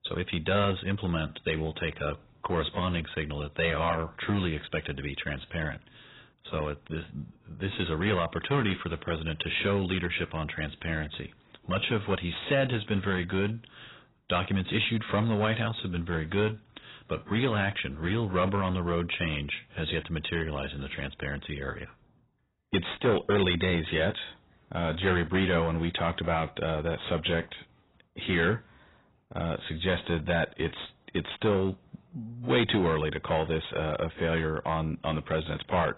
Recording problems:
garbled, watery; badly; nothing above 4 kHz
distortion; slight; 4% of the sound clipped

